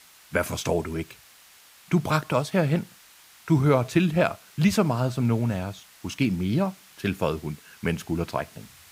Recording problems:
hiss; faint; throughout; 25 dB below the speech

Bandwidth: 15.5 kHz